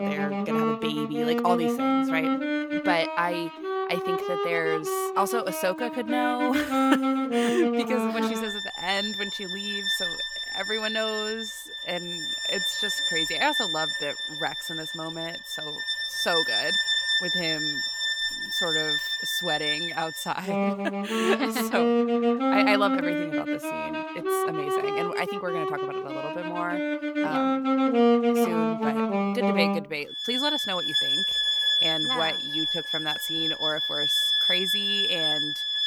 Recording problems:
background music; very loud; throughout; 5 dB above the speech

